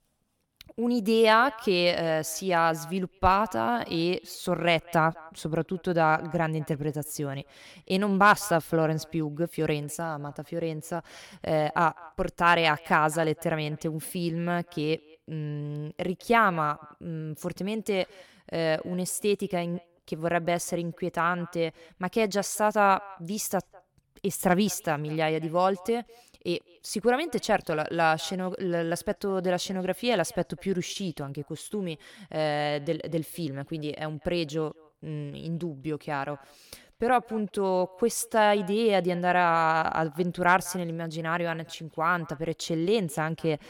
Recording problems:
echo of what is said; faint; throughout; 200 ms later, 25 dB below the speech

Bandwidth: 18 kHz